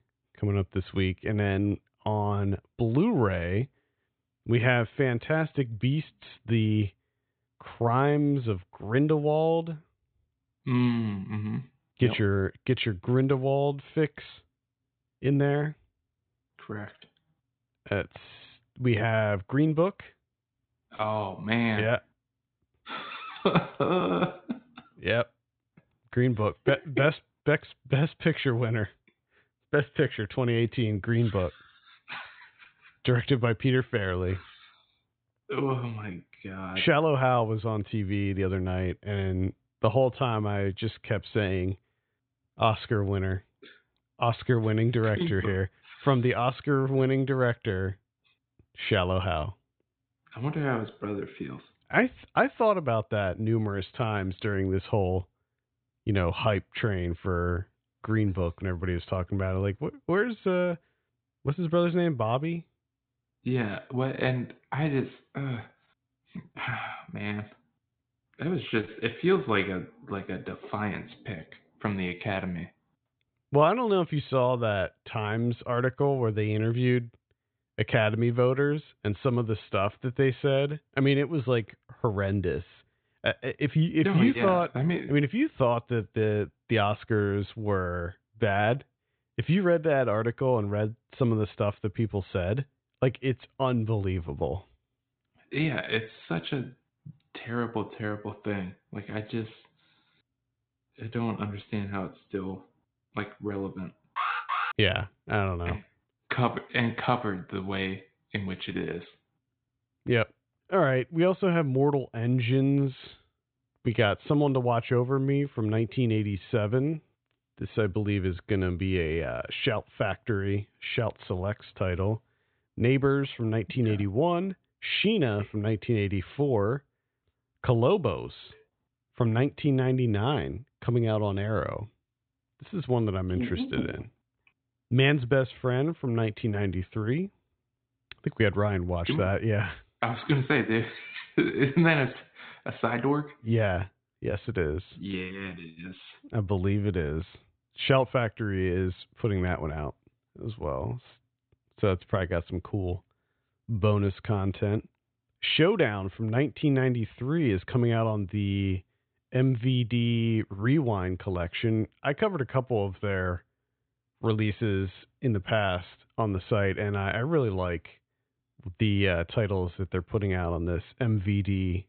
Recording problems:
high frequencies cut off; severe; nothing above 4 kHz
alarm; noticeable; at 1:44; peak 1 dB below the speech

